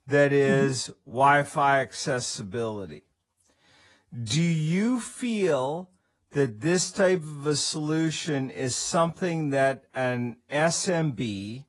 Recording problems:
wrong speed, natural pitch; too slow; 0.7 times normal speed
garbled, watery; slightly

